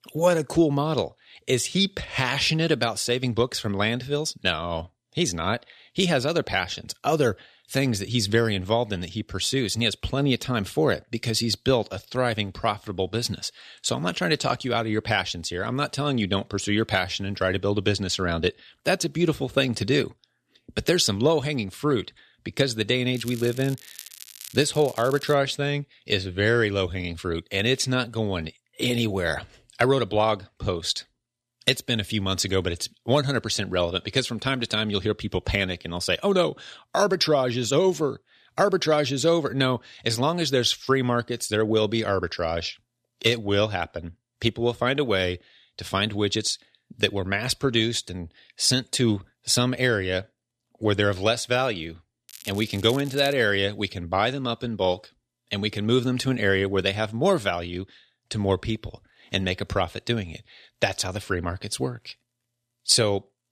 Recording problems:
crackling; noticeable; from 23 to 25 s and from 52 to 53 s; 15 dB below the speech

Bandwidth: 14 kHz